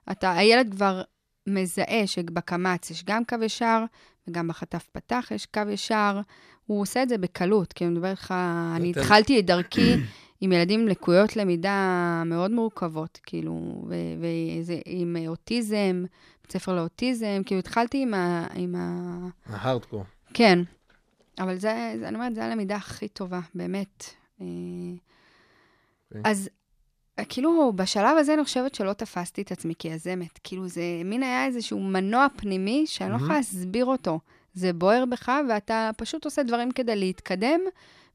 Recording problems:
none

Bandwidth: 14.5 kHz